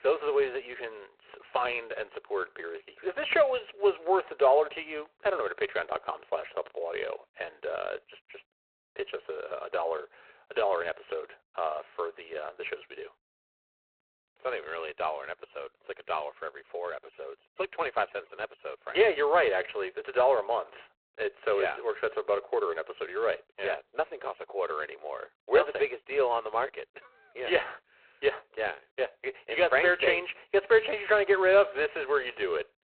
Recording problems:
phone-call audio; poor line; nothing above 4 kHz

